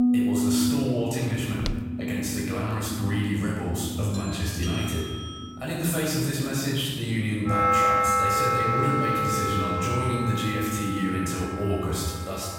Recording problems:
room echo; strong; dies away in 1.6 s
off-mic speech; far
background music; very loud; throughout; 1 dB above the speech
footsteps; noticeable; at 1.5 s; peak 8 dB below the speech
doorbell; noticeable; from 4 to 5.5 s; peak 7 dB below the speech
phone ringing; noticeable; from 8.5 to 10 s; peak 10 dB below the speech

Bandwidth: 16 kHz